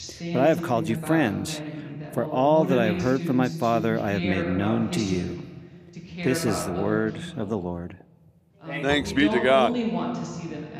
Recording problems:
voice in the background; loud; throughout; 6 dB below the speech

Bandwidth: 15 kHz